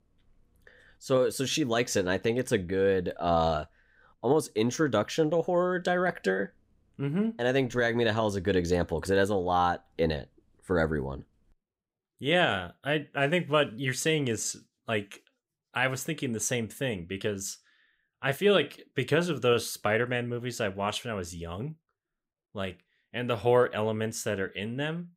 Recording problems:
none

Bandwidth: 15.5 kHz